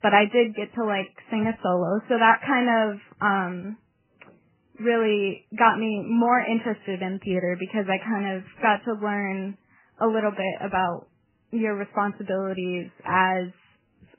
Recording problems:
garbled, watery; badly; nothing above 3 kHz

